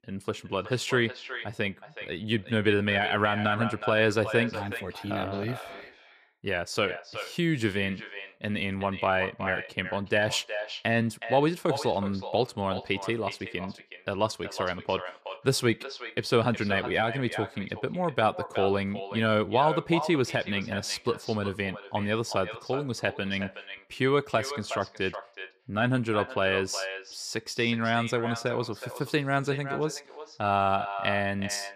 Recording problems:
echo of what is said; strong; throughout; 370 ms later, 10 dB below the speech

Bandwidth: 14.5 kHz